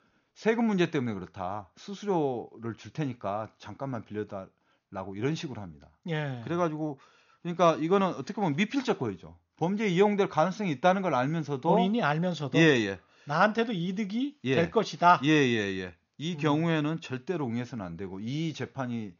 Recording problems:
high frequencies cut off; noticeable; nothing above 7 kHz

